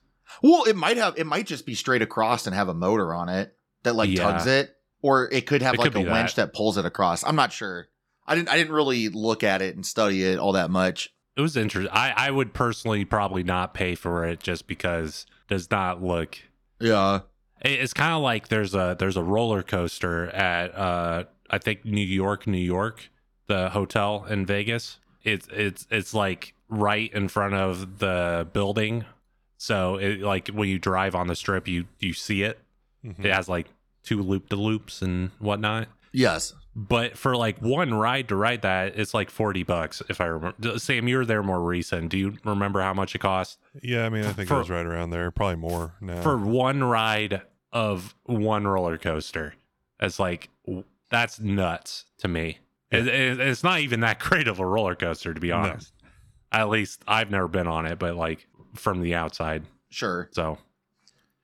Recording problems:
none

